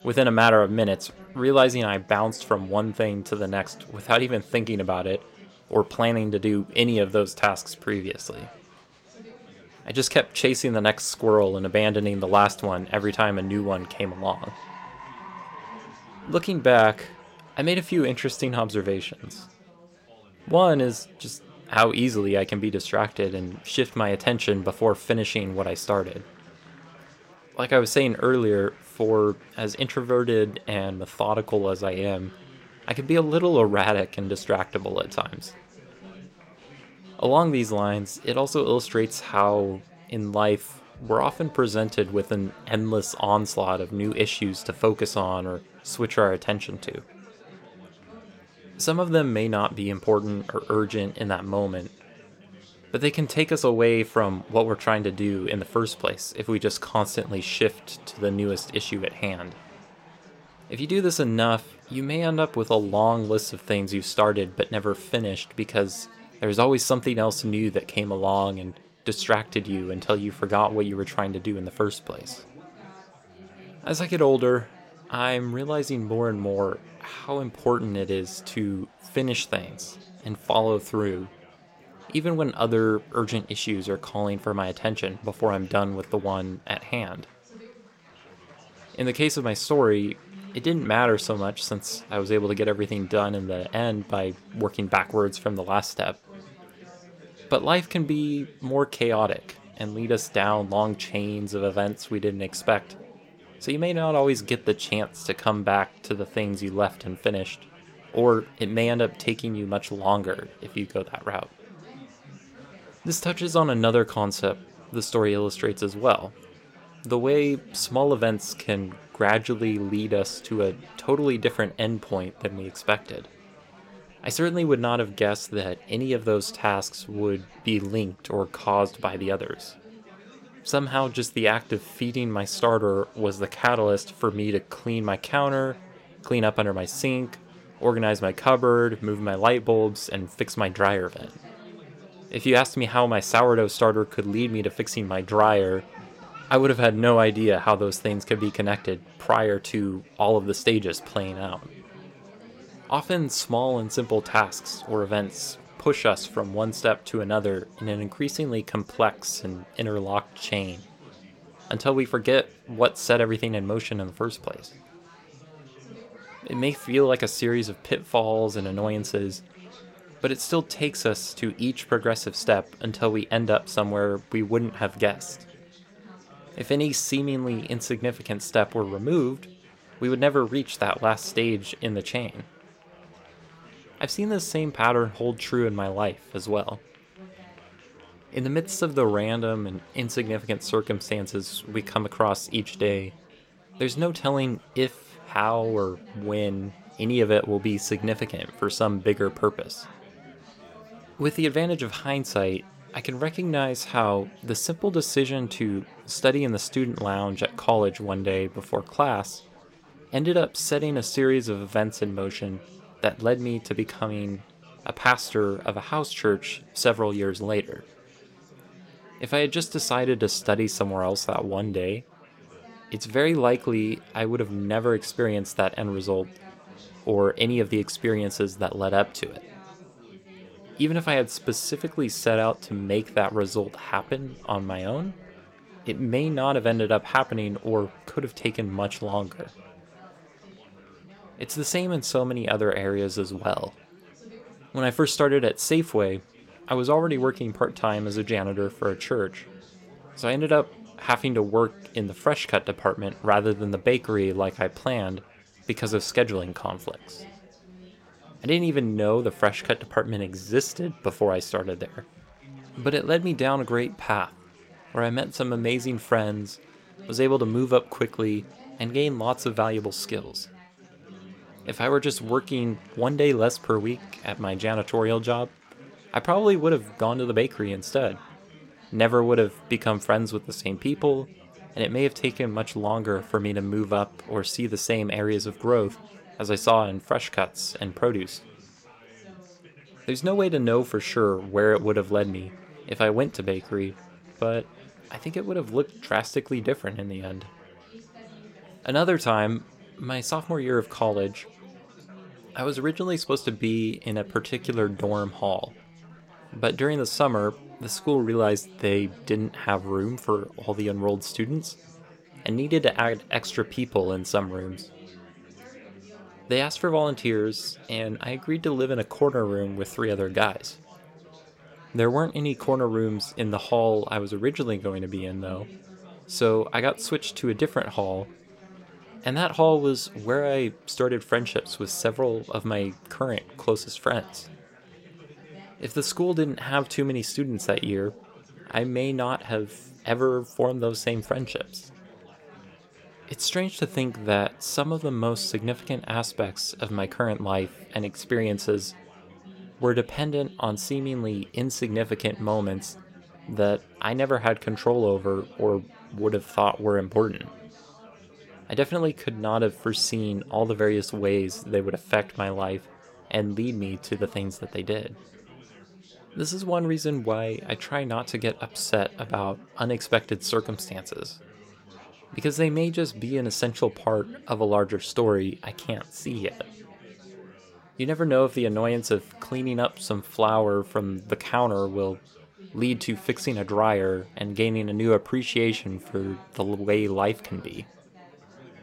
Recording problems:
chatter from many people; faint; throughout; 25 dB below the speech

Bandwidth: 16 kHz